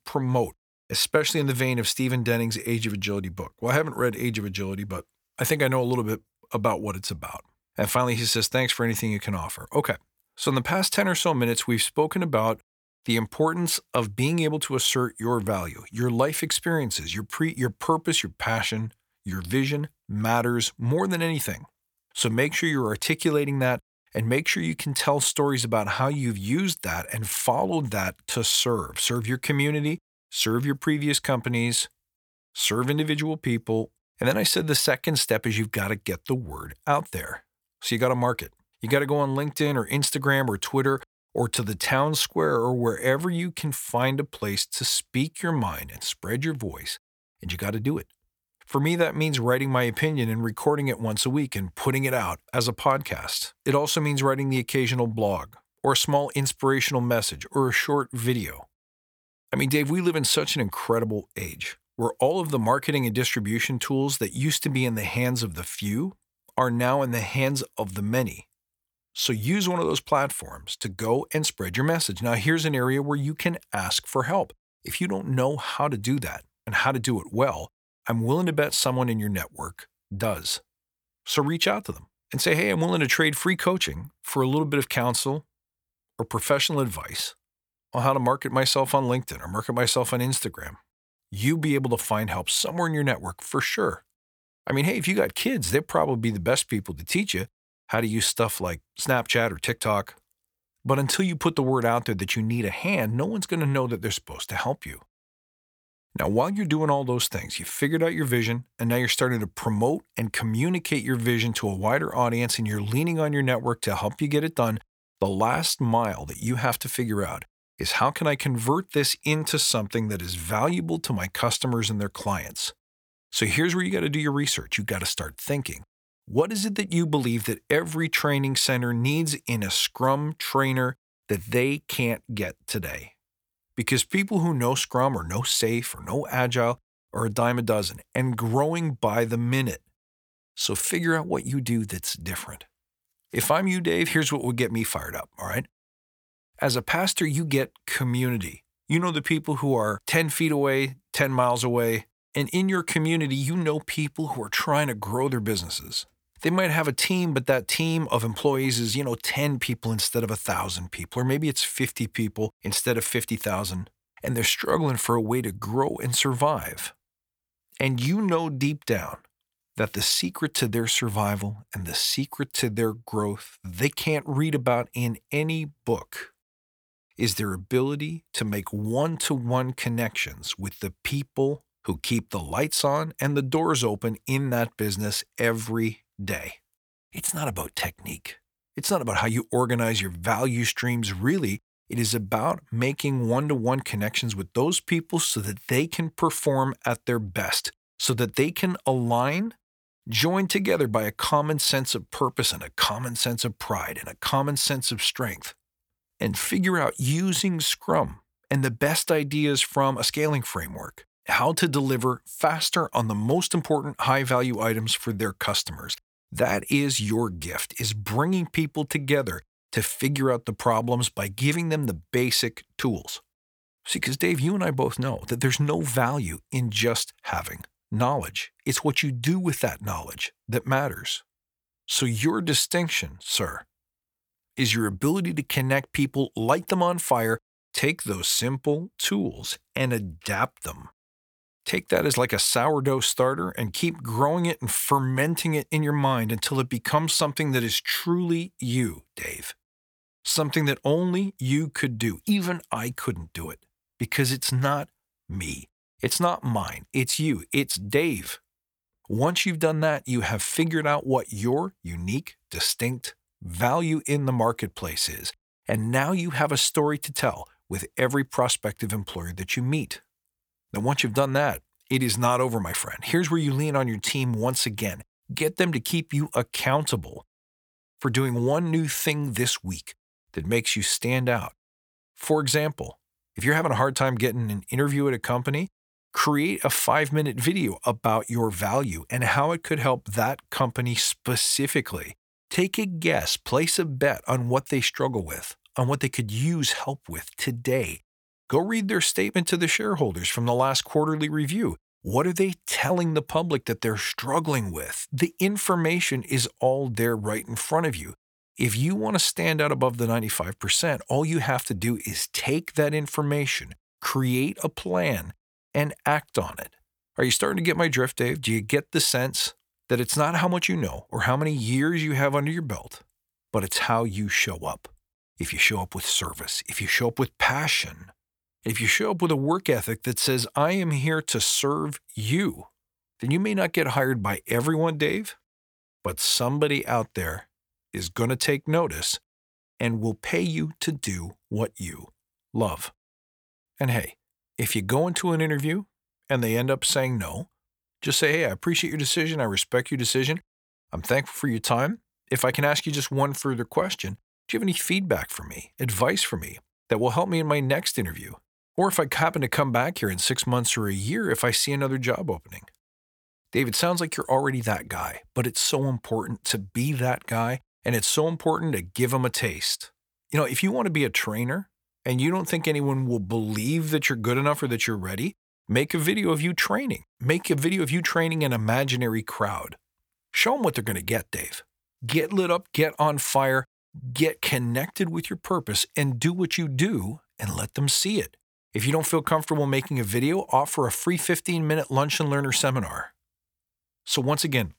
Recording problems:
none

